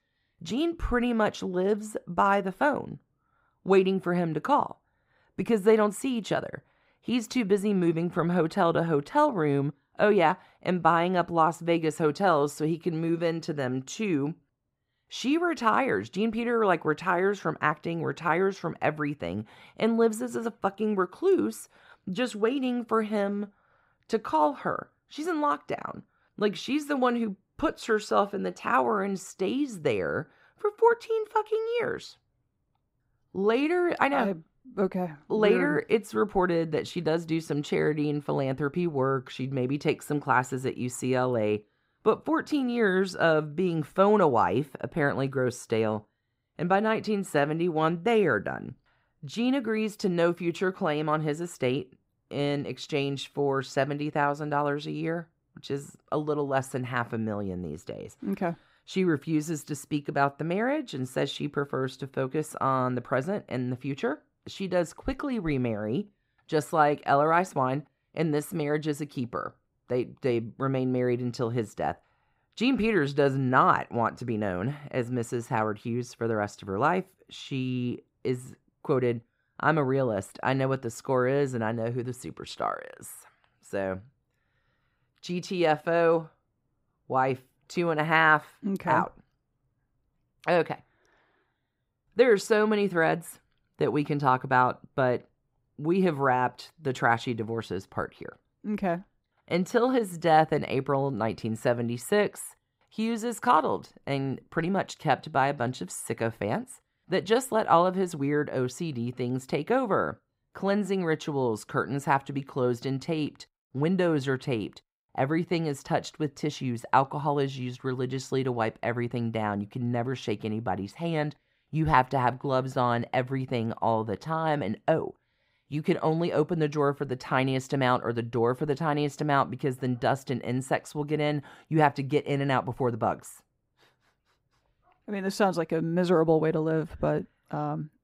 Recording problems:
muffled; slightly; fading above 2 kHz

